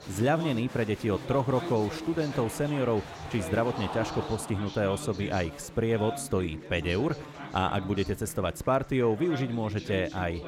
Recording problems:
chatter from many people; noticeable; throughout; 10 dB below the speech

